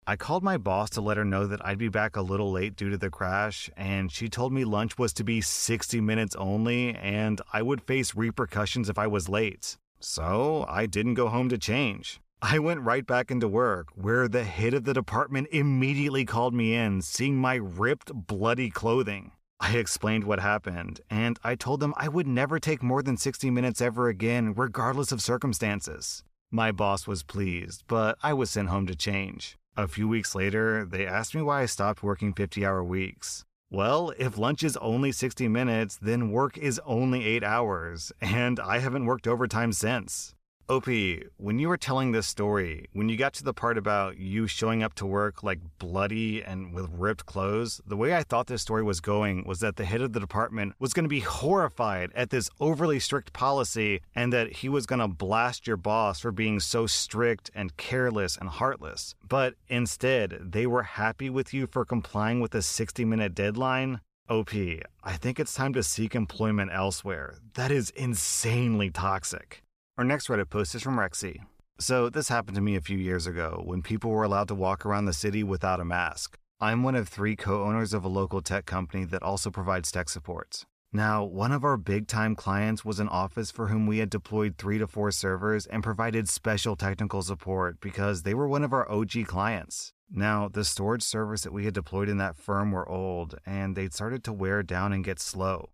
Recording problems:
none

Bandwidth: 14.5 kHz